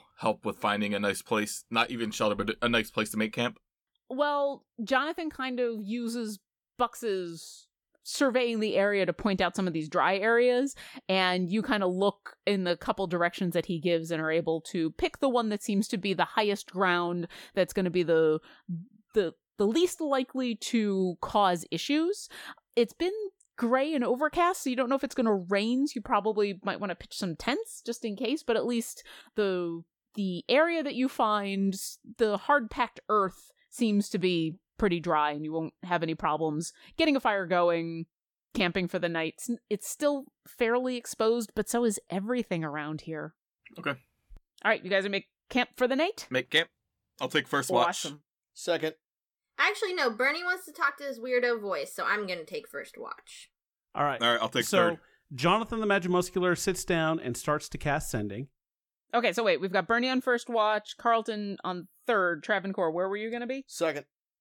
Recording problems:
none

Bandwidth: 17.5 kHz